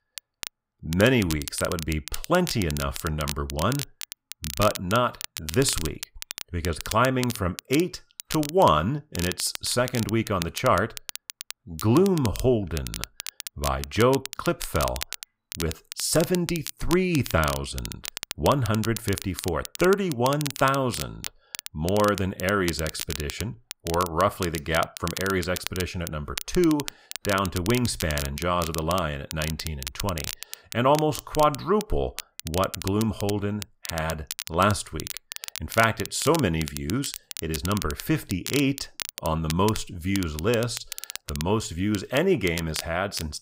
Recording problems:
crackle, like an old record; loud; 10 dB below the speech

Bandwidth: 15.5 kHz